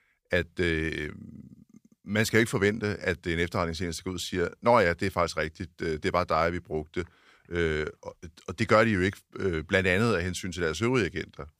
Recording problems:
none

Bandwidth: 15 kHz